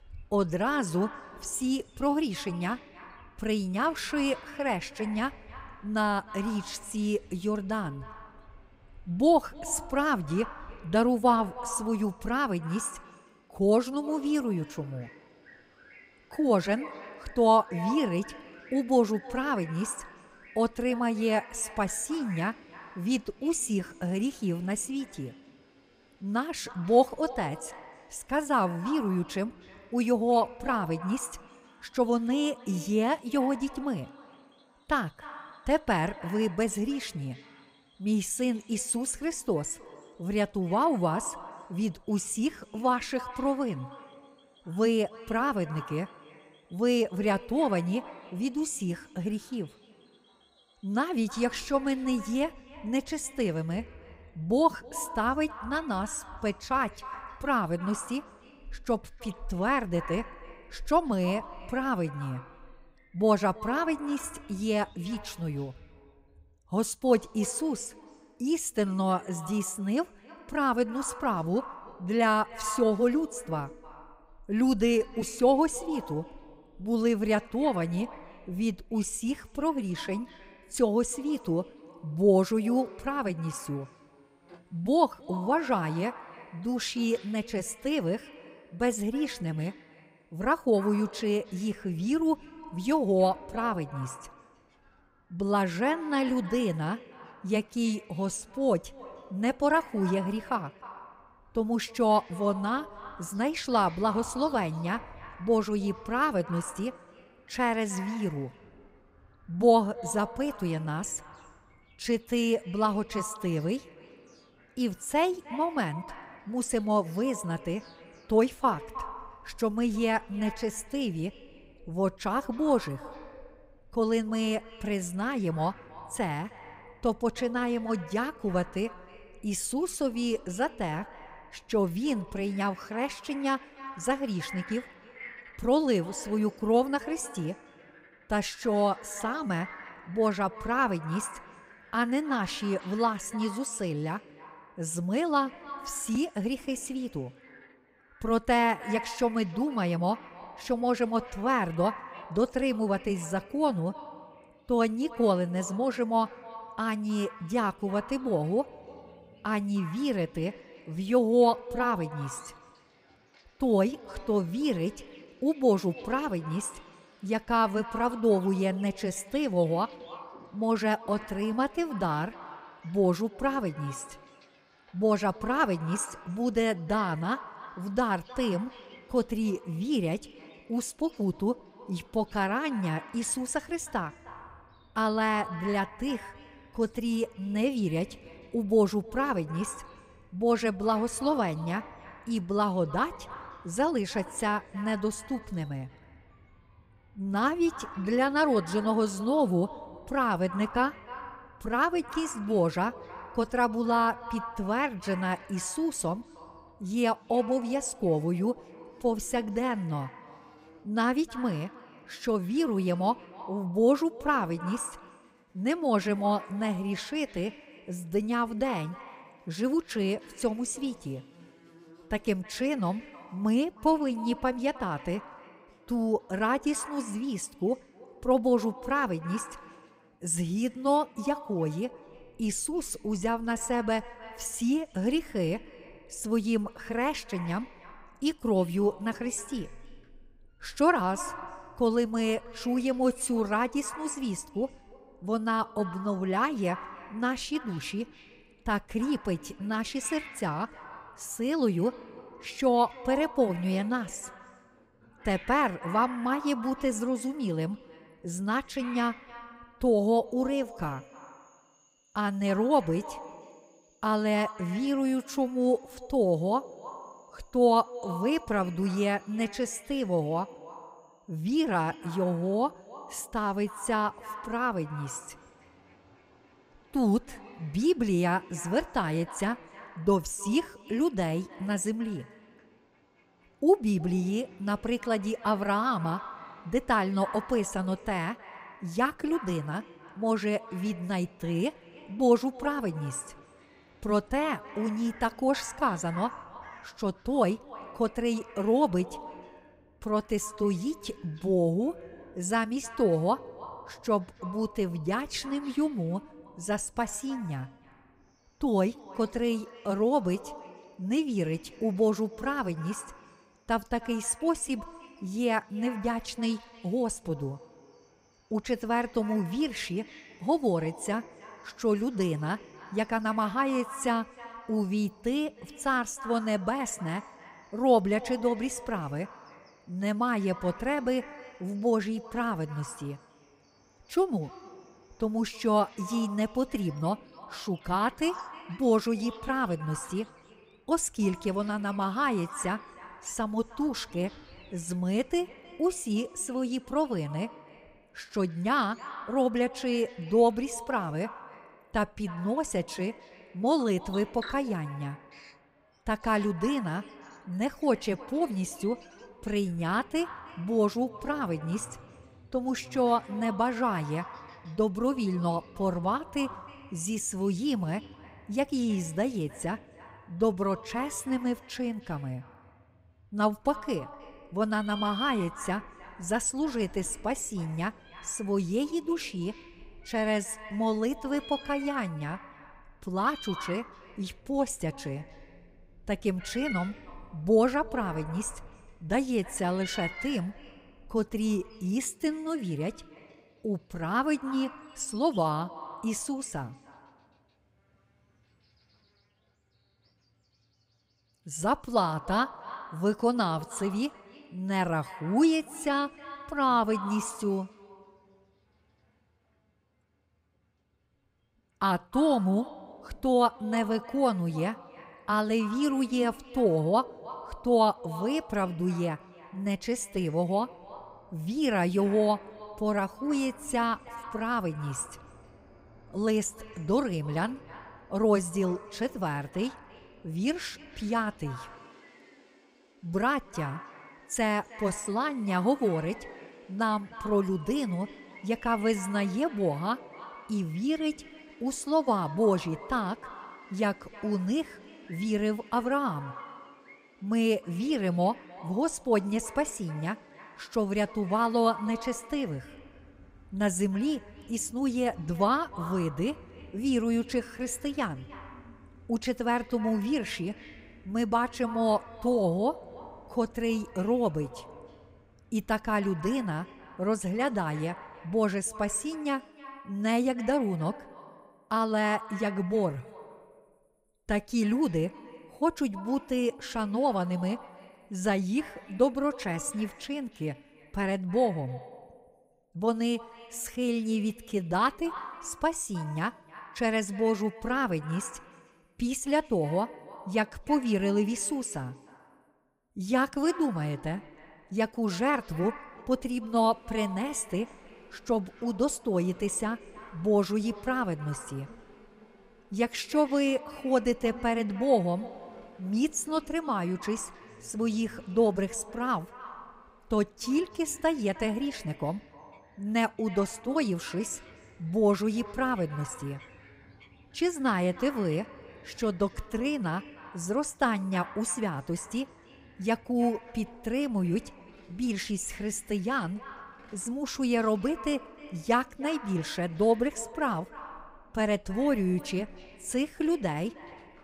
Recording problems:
echo of what is said; noticeable; throughout; 310 ms later, 15 dB below the speech
animal sounds; faint; throughout; 25 dB below the speech

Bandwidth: 15.5 kHz